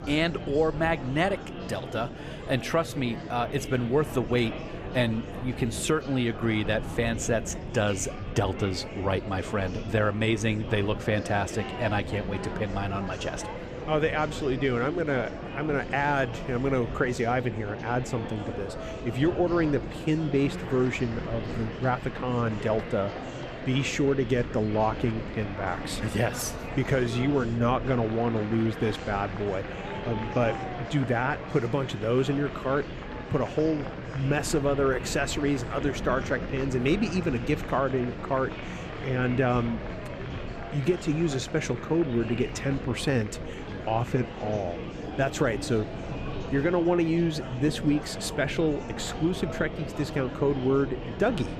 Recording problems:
murmuring crowd; loud; throughout; 9 dB below the speech
wind noise on the microphone; occasional gusts; 20 dB below the speech

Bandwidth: 14.5 kHz